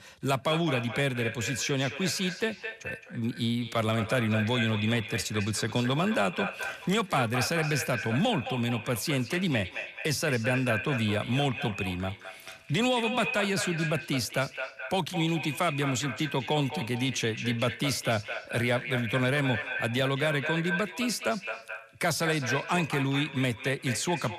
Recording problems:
echo of what is said; strong; throughout; 220 ms later, 7 dB below the speech

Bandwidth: 14 kHz